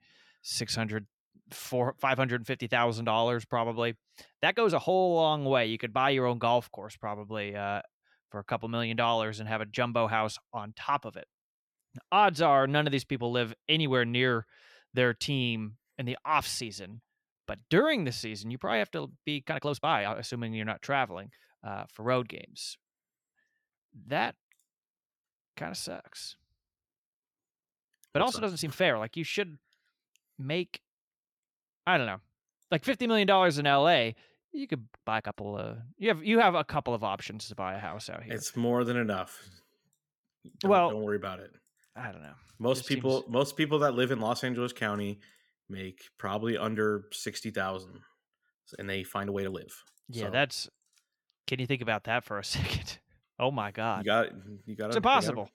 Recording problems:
uneven, jittery; strongly; from 4.5 to 50 s

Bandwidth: 18 kHz